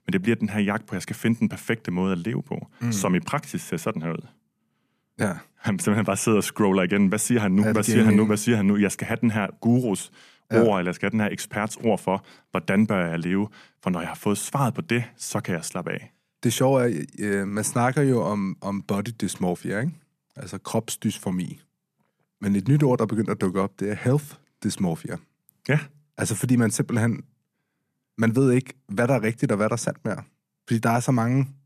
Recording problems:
none

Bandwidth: 14.5 kHz